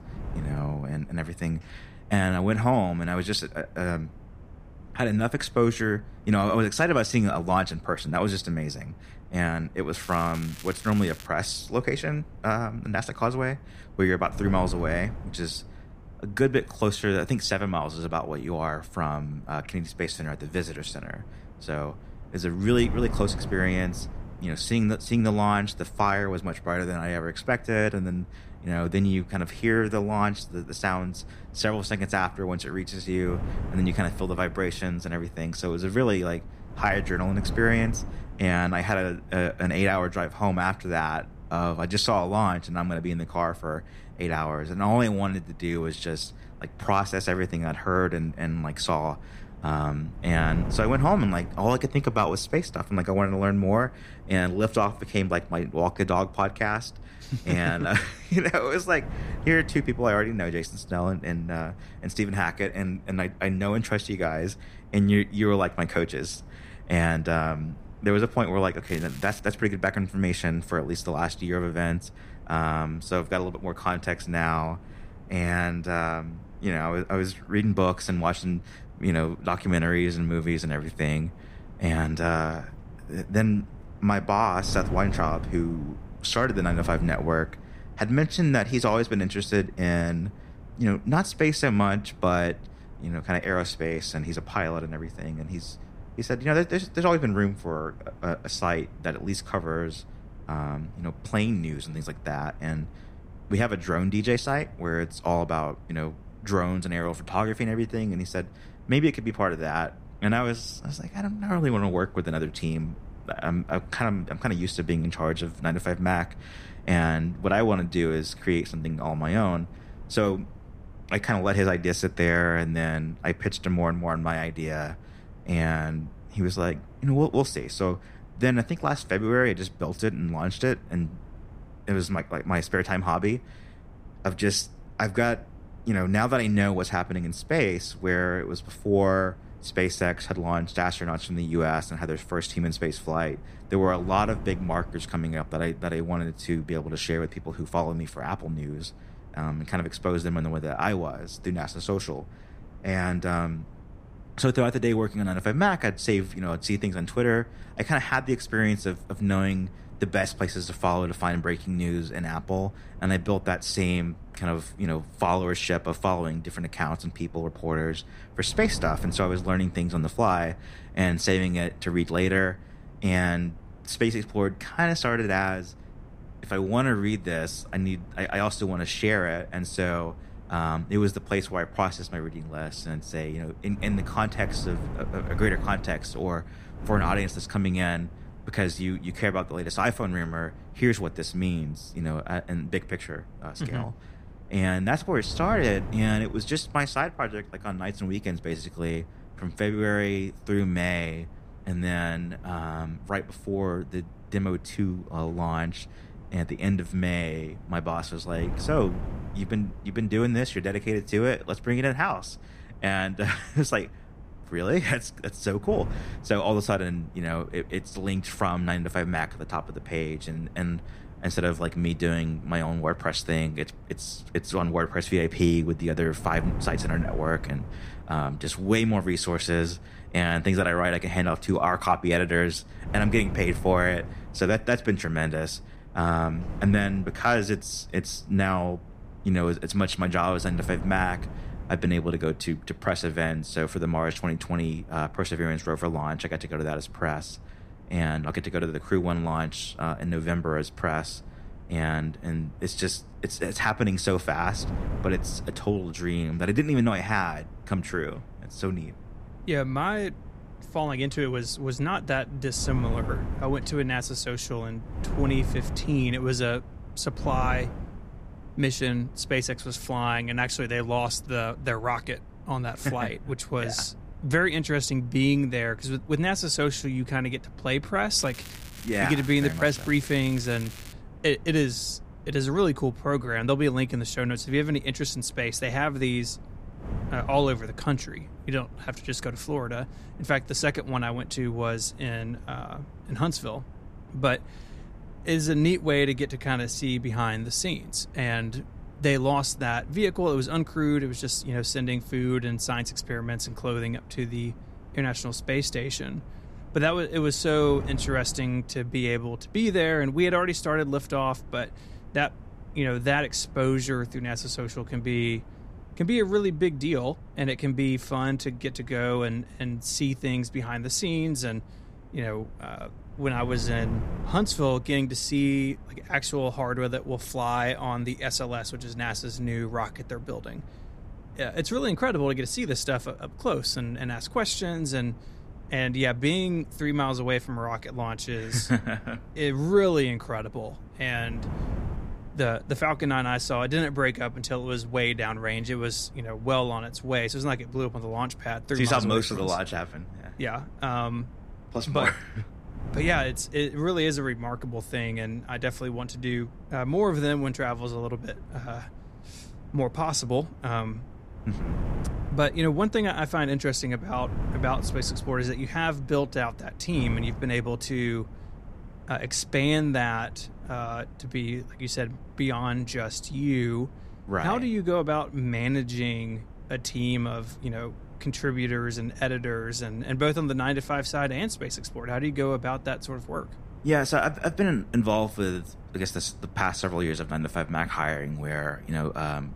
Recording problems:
wind noise on the microphone; occasional gusts; 20 dB below the speech
crackling; noticeable; from 10 to 11 s, at 1:09 and from 4:38 to 4:41; 15 dB below the speech

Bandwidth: 15 kHz